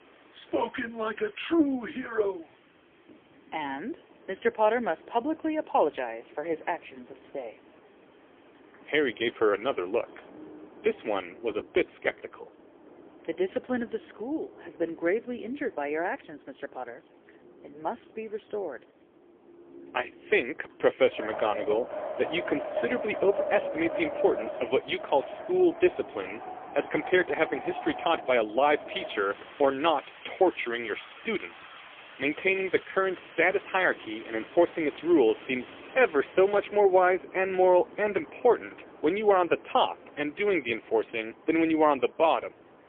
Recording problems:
phone-call audio; poor line; nothing above 3.5 kHz
wind in the background; noticeable; throughout; 15 dB below the speech

